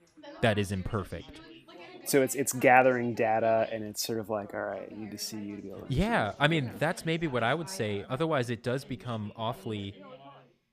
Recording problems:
background chatter; faint; throughout; 3 voices, 20 dB below the speech

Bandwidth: 15 kHz